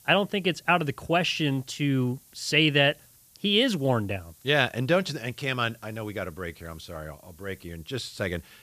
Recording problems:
hiss; faint; throughout; 30 dB below the speech

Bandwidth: 14.5 kHz